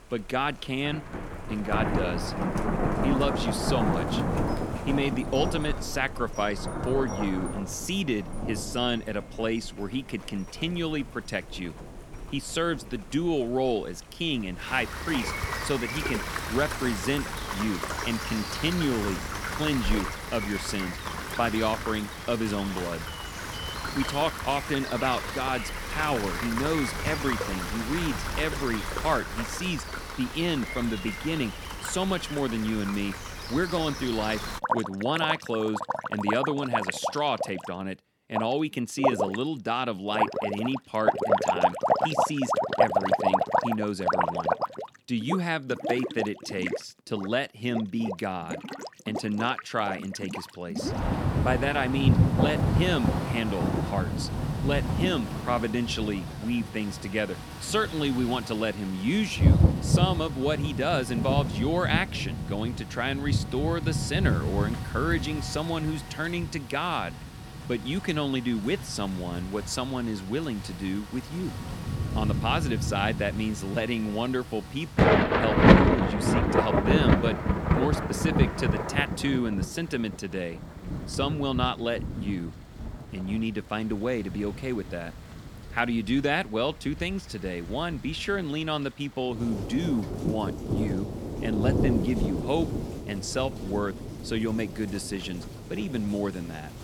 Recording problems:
rain or running water; very loud; throughout; as loud as the speech

